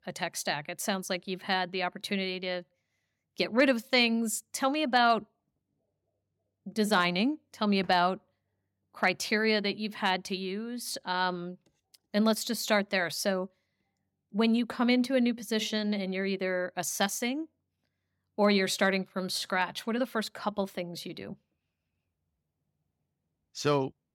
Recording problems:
none

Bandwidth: 17 kHz